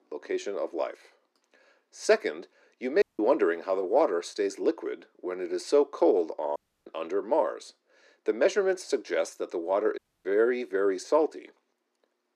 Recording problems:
thin; somewhat; fading below 300 Hz
muffled; very slightly; fading above 2.5 kHz
audio cutting out; at 3 s, at 6.5 s and at 10 s

